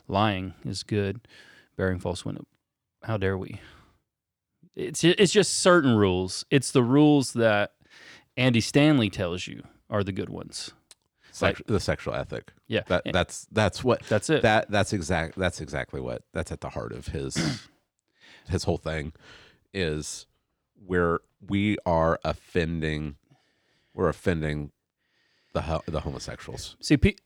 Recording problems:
none

